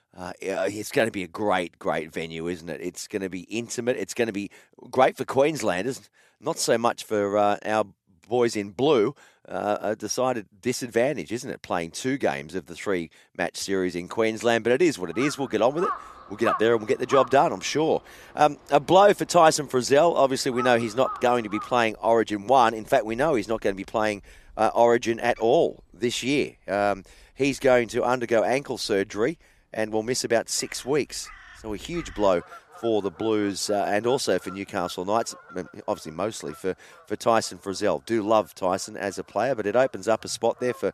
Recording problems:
animal sounds; noticeable; from 15 s on; 15 dB below the speech

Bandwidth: 14 kHz